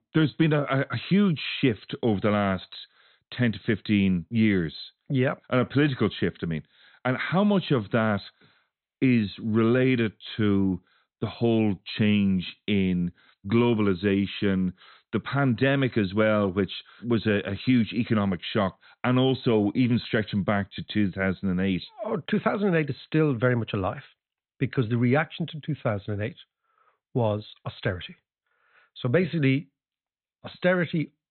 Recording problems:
high frequencies cut off; severe; nothing above 4 kHz

